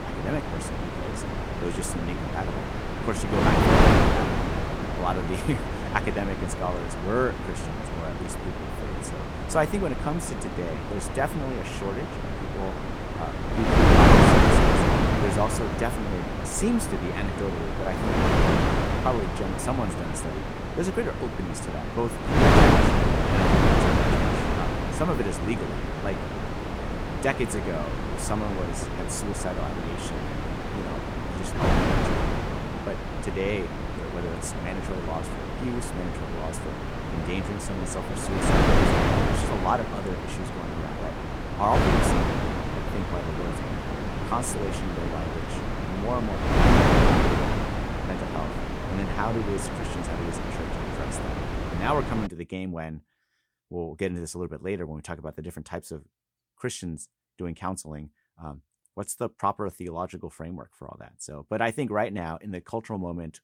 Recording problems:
wind noise on the microphone; heavy; until 52 s; 5 dB above the speech

